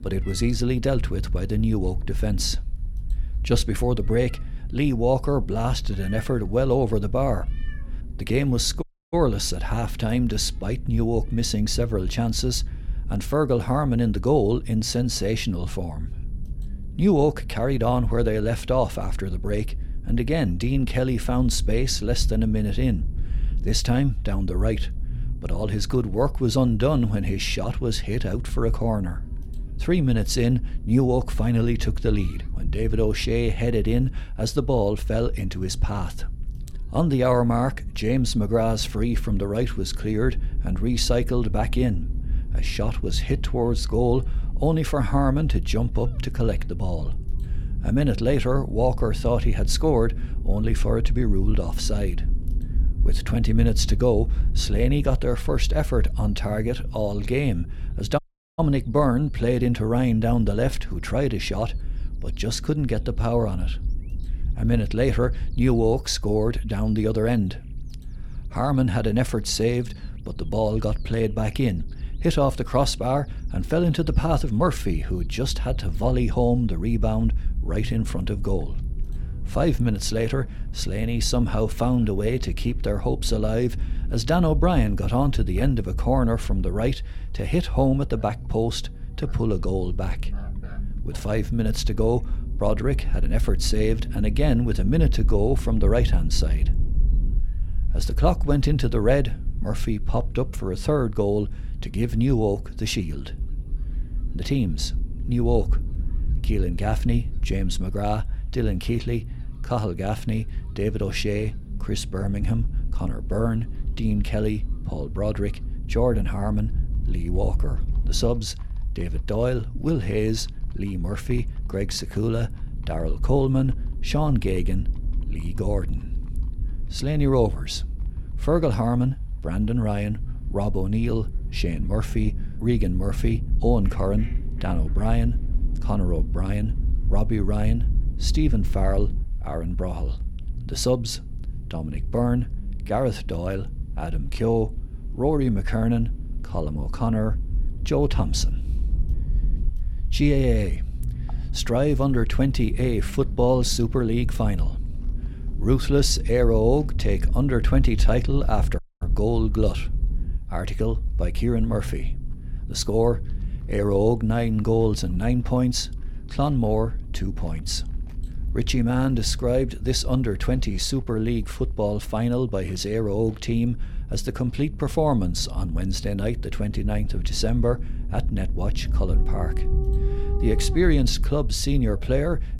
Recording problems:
animal sounds; faint; throughout; 25 dB below the speech
low rumble; faint; throughout; 20 dB below the speech
audio cutting out; at 9 s, at 58 s and at 2:39

